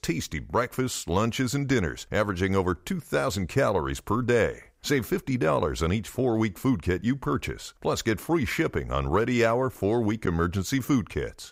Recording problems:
none

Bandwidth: 15.5 kHz